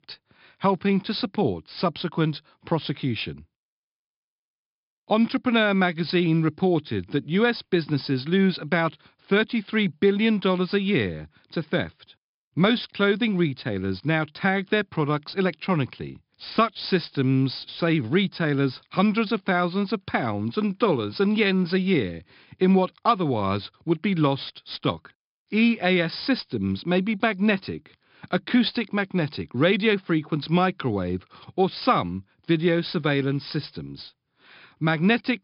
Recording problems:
high frequencies cut off; noticeable; nothing above 5.5 kHz

